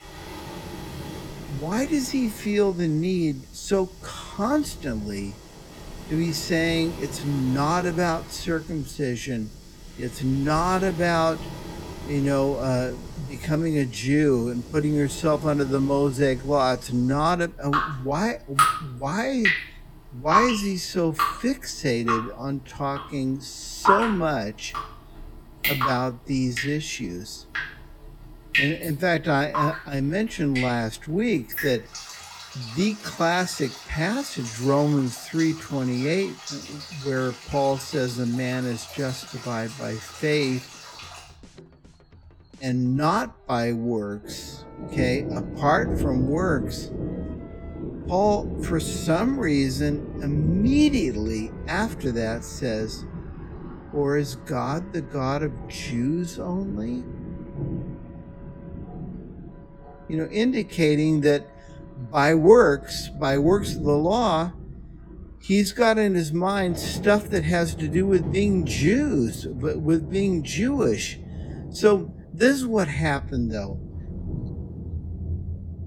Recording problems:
wrong speed, natural pitch; too slow; 0.6 times normal speed
rain or running water; loud; throughout; 8 dB below the speech
background music; faint; throughout; 30 dB below the speech

